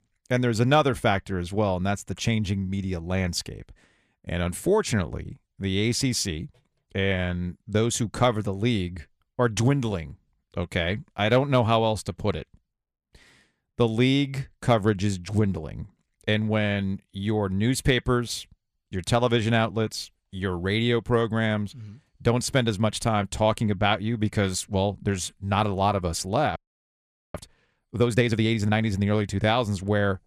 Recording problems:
audio freezing; at 27 s for 1 s

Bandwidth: 14.5 kHz